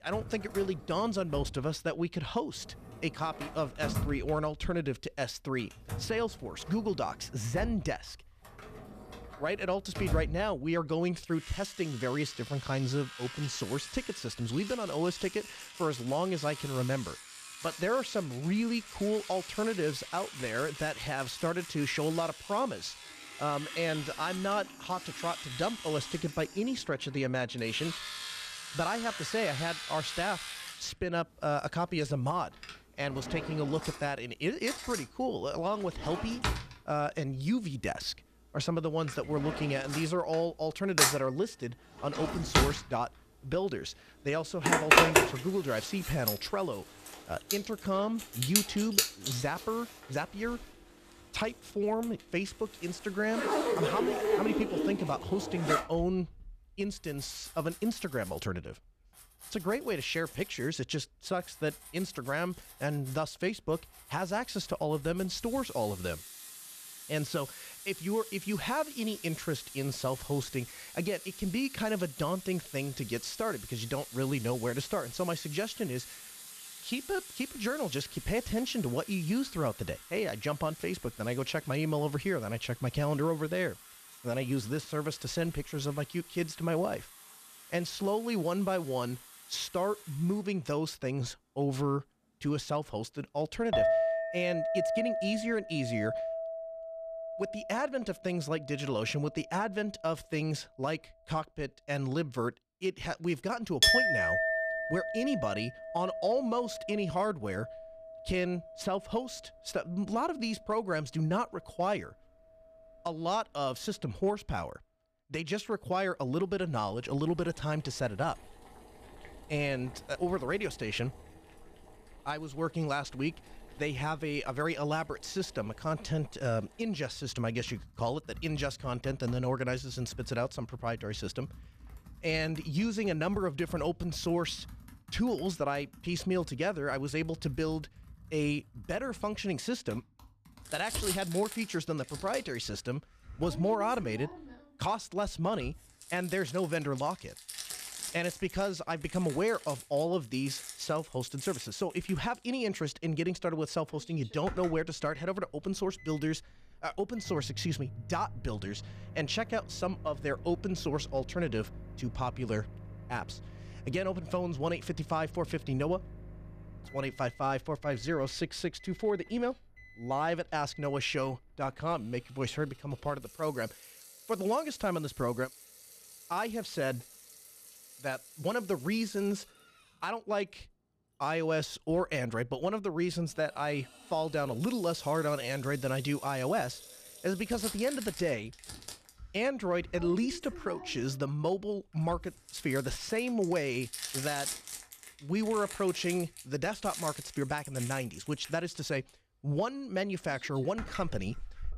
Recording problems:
household noises; loud; throughout; 3 dB below the speech

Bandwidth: 14.5 kHz